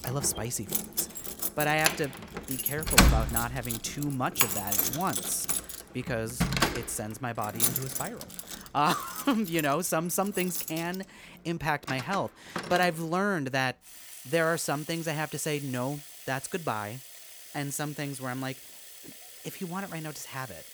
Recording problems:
household noises; very loud; throughout; 2 dB above the speech

